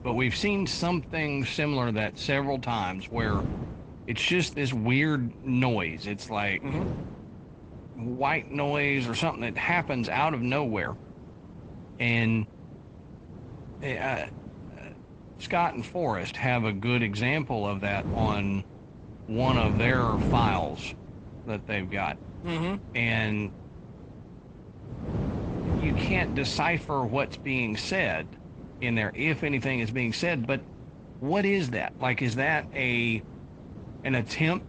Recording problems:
garbled, watery; slightly; nothing above 8 kHz
wind noise on the microphone; occasional gusts; 15 dB below the speech

